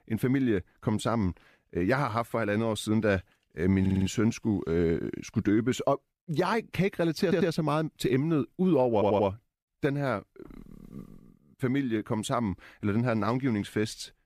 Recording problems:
audio stuttering; at 4 s, at 7 s and at 9 s

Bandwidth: 14.5 kHz